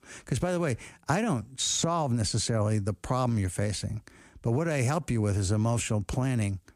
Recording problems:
none

